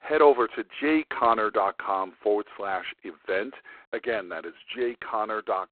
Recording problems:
phone-call audio; poor line; nothing above 4 kHz
muffled; very slightly; fading above 3 kHz

